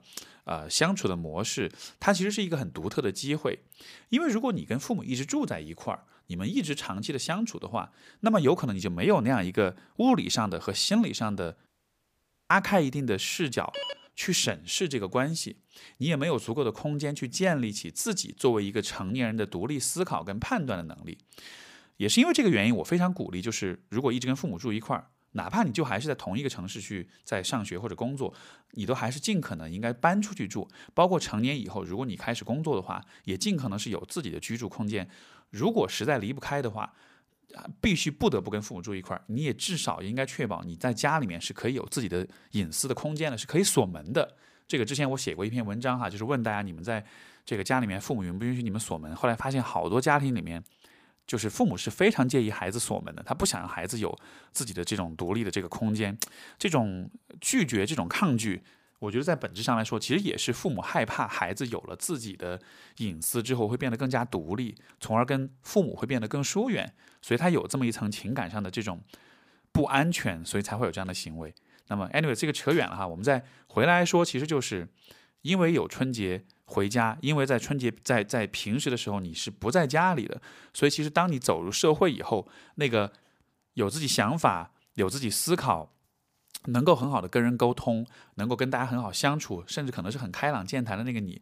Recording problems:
audio cutting out; at 12 s for 1 s
phone ringing; noticeable; at 14 s; peak 7 dB below the speech

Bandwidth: 15 kHz